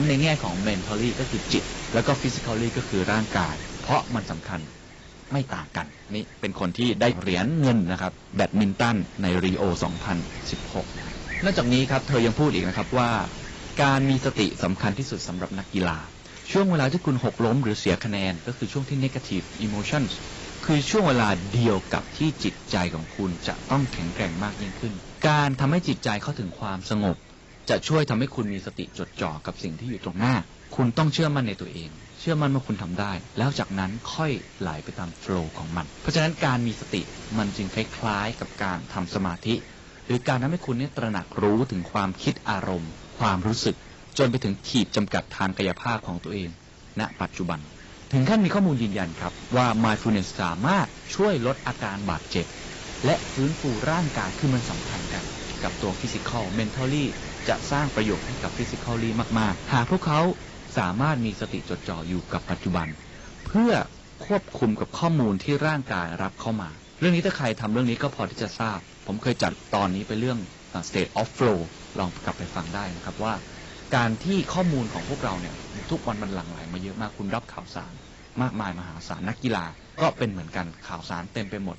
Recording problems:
garbled, watery; badly; nothing above 8 kHz
distortion; slight; 3% of the sound clipped
wind noise on the microphone; occasional gusts; 10 dB below the speech
abrupt cut into speech; at the start

